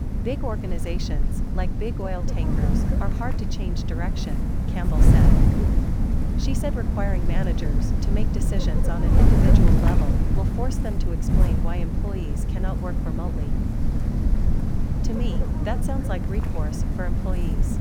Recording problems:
wind noise on the microphone; heavy; 1 dB above the speech

